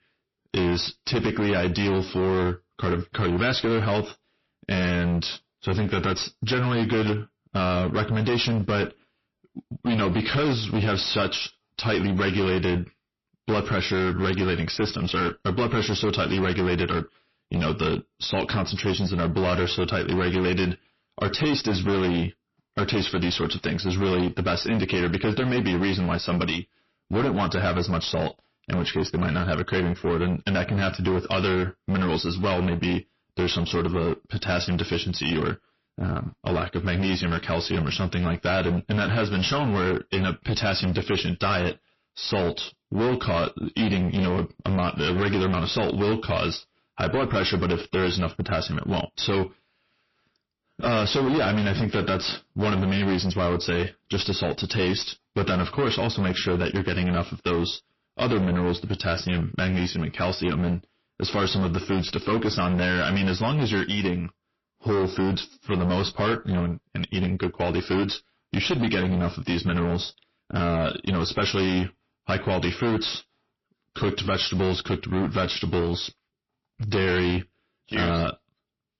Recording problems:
distortion; heavy; 22% of the sound clipped
garbled, watery; slightly; nothing above 5.5 kHz

